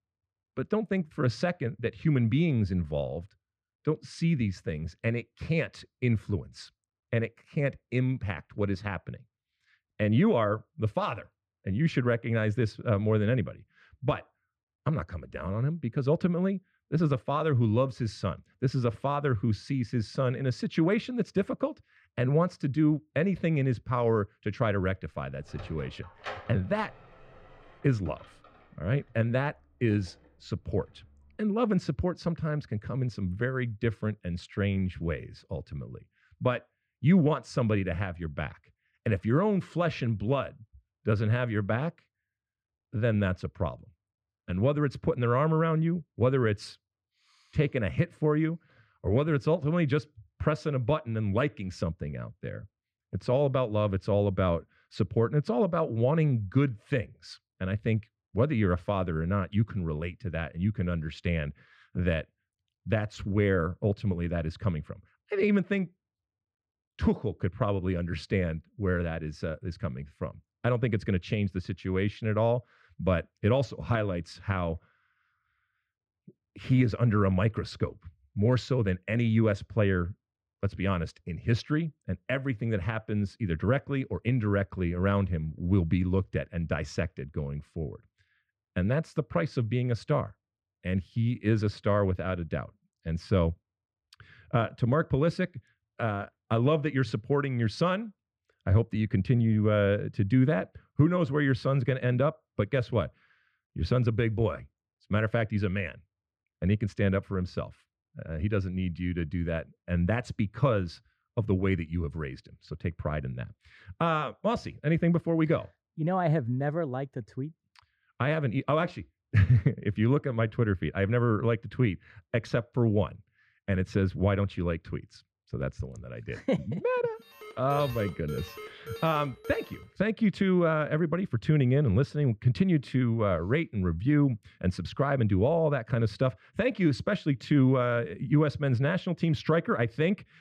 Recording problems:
muffled; slightly; fading above 2.5 kHz
door banging; faint; from 25 to 30 s; peak 10 dB below the speech
alarm; faint; from 2:07 to 2:10; peak 10 dB below the speech

